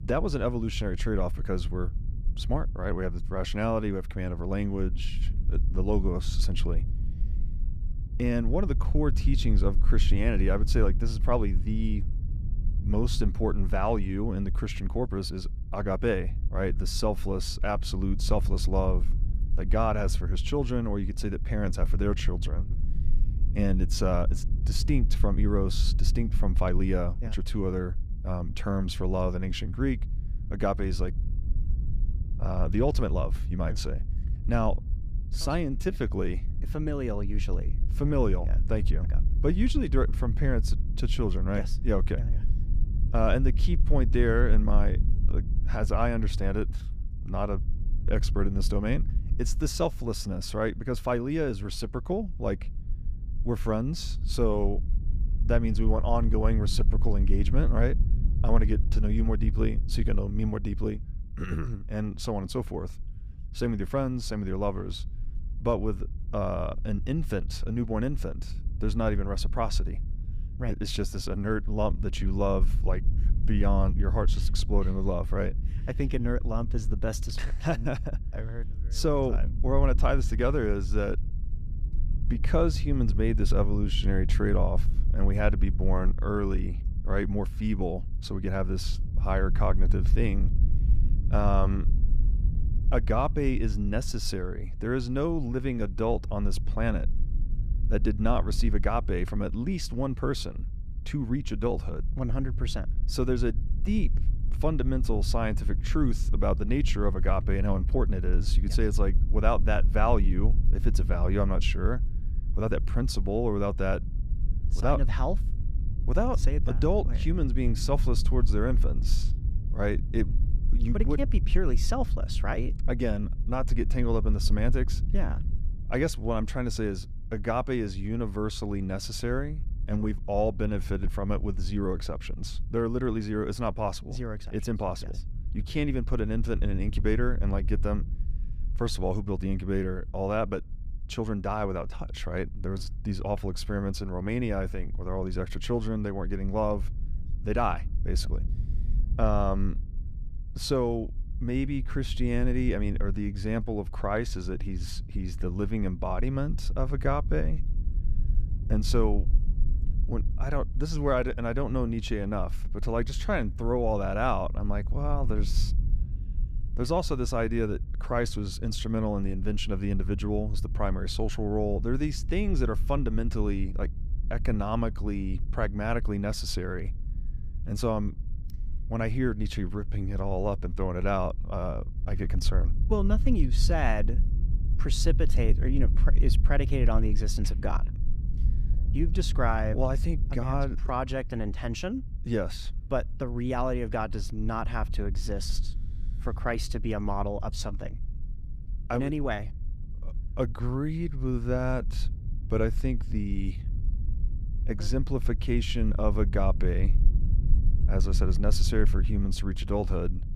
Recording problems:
low rumble; noticeable; throughout; 15 dB below the speech

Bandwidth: 15 kHz